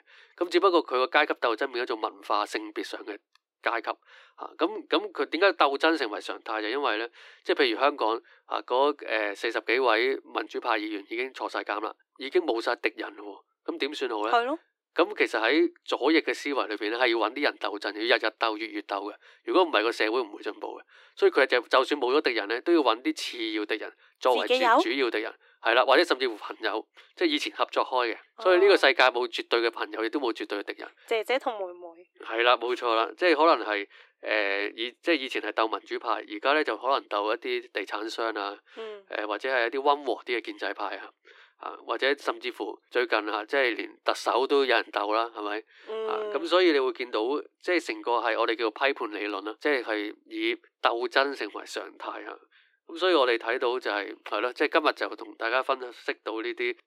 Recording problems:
thin; somewhat; fading below 300 Hz

